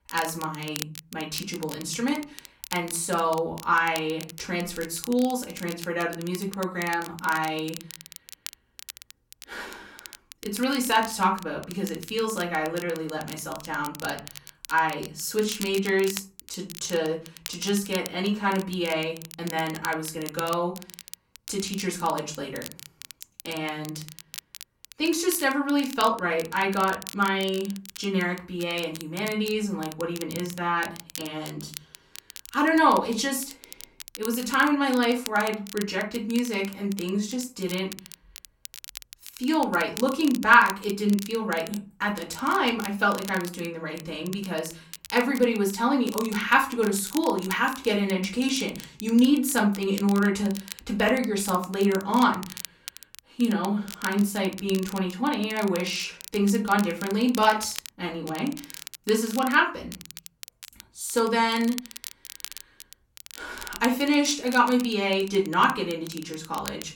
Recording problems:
off-mic speech; far
room echo; very slight; dies away in 0.4 s
crackle, like an old record; noticeable; 15 dB below the speech

